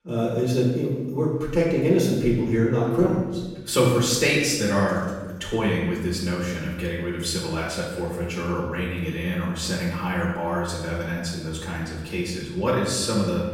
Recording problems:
off-mic speech; far
room echo; noticeable; dies away in 1.1 s

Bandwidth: 16 kHz